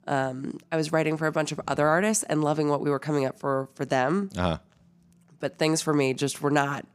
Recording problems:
none

